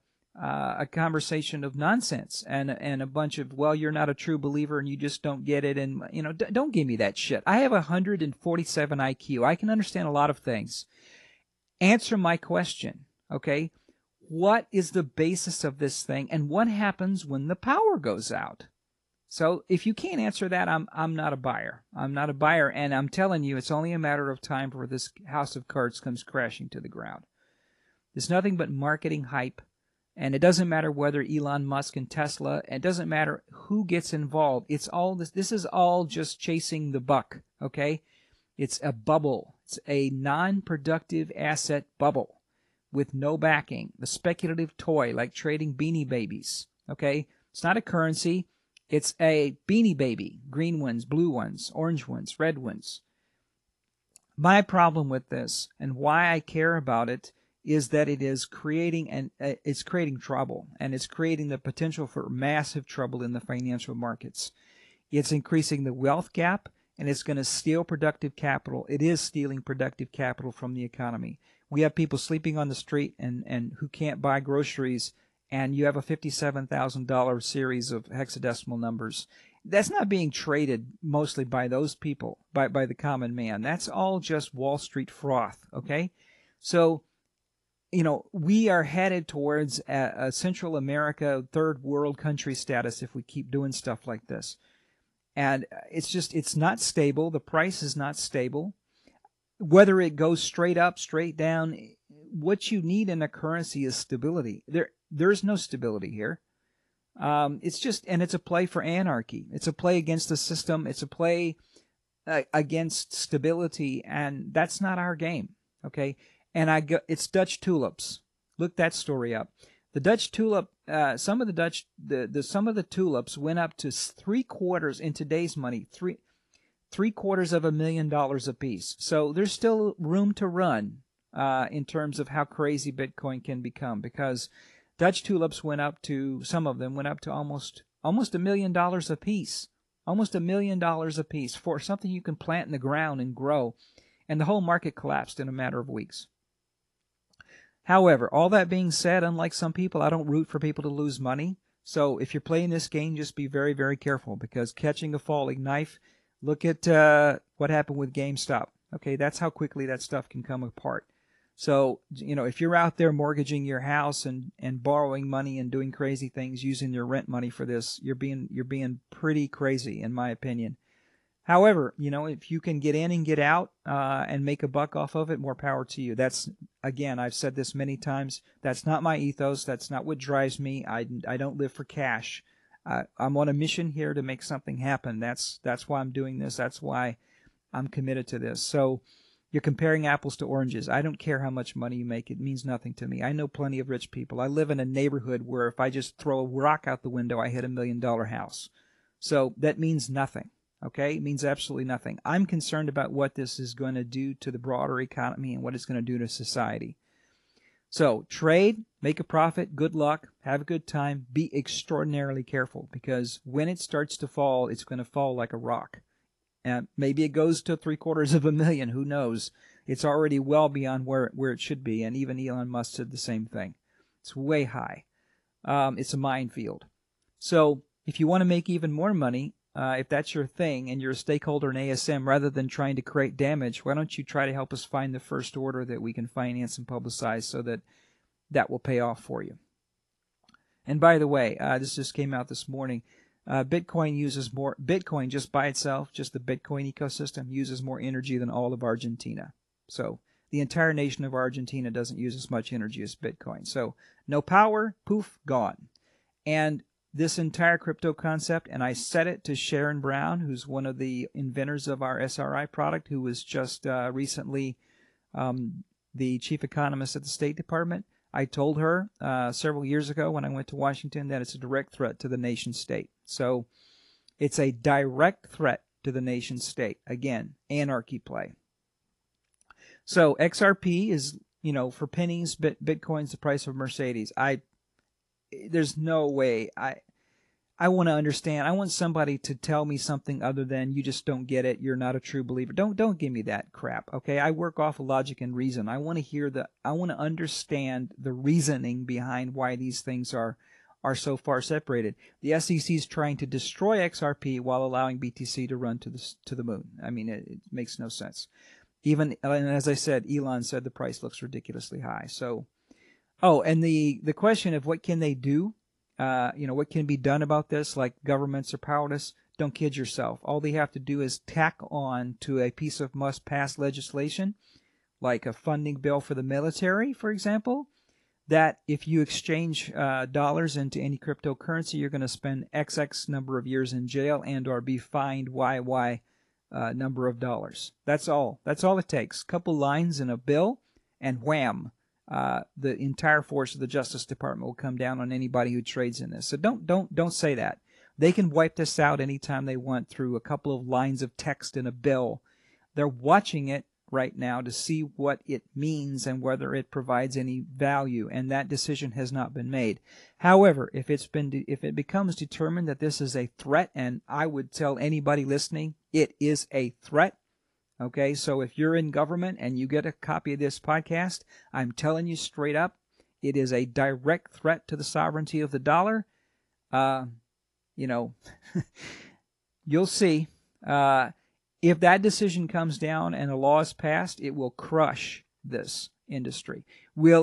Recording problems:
garbled, watery; slightly; nothing above 11 kHz
abrupt cut into speech; at the end

